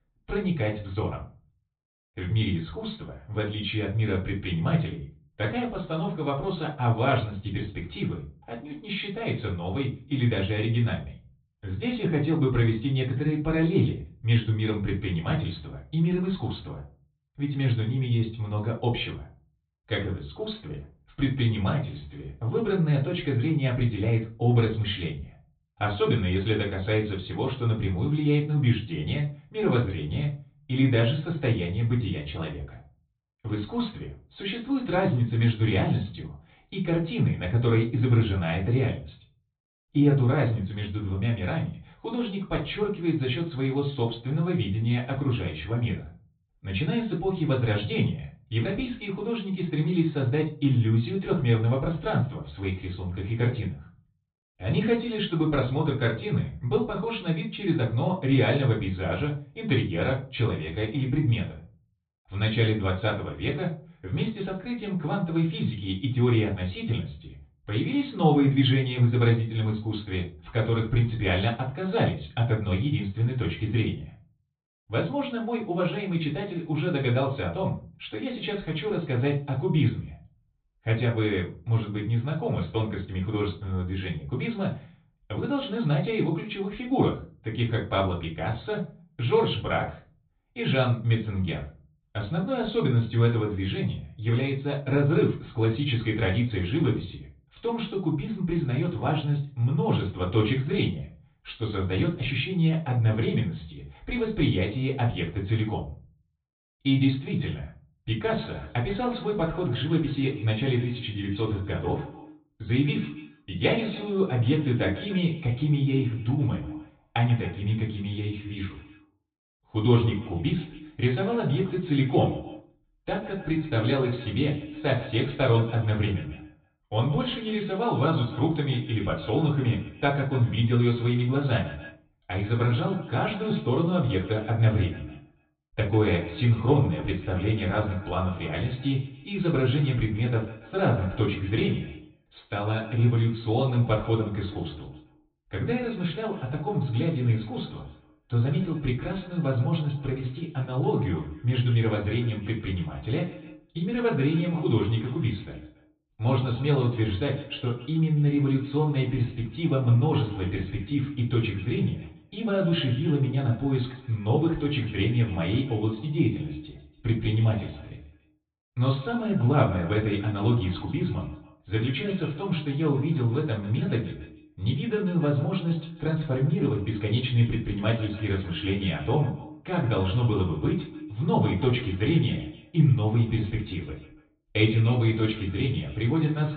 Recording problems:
off-mic speech; far
high frequencies cut off; severe; nothing above 4 kHz
echo of what is said; noticeable; from 1:48 on; 140 ms later, 15 dB below the speech
room echo; slight; dies away in 0.3 s

